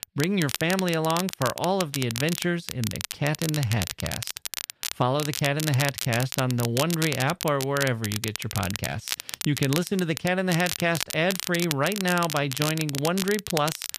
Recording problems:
crackle, like an old record; loud; 6 dB below the speech

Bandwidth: 14.5 kHz